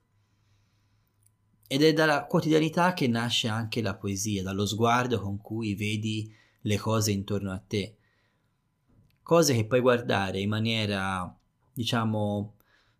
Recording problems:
none

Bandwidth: 15 kHz